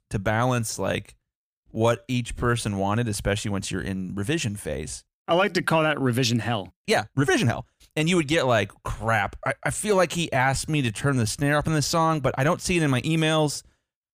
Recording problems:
uneven, jittery; strongly; from 1.5 to 11 s

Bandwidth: 15 kHz